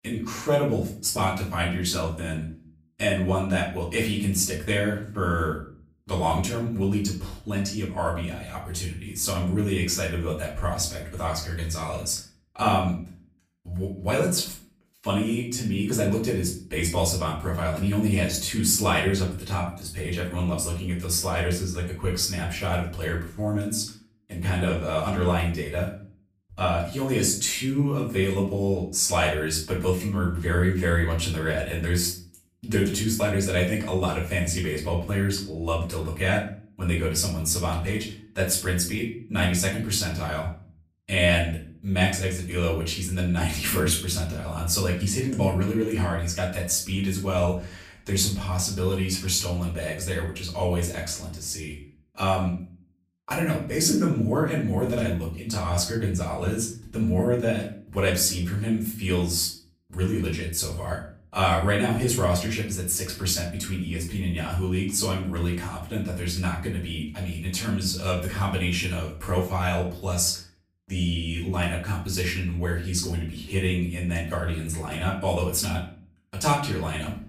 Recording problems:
off-mic speech; far
room echo; slight; dies away in 0.4 s

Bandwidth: 15 kHz